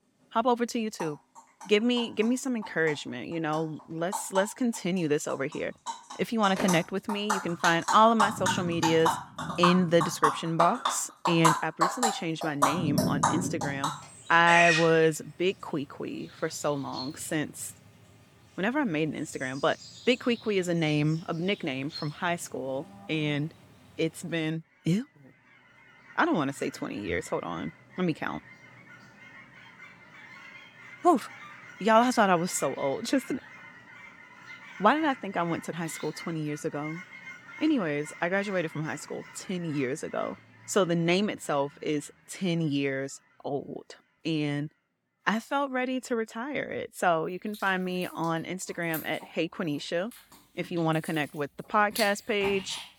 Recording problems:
animal sounds; loud; throughout; 4 dB below the speech

